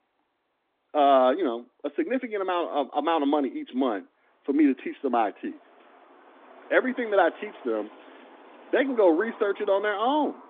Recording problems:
phone-call audio
traffic noise; faint; throughout; 20 dB below the speech

